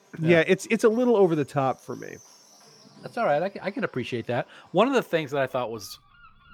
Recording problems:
animal sounds; faint; throughout; 30 dB below the speech

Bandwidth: 18.5 kHz